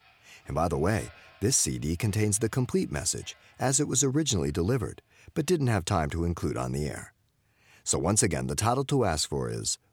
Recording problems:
household noises; faint; throughout; 30 dB below the speech

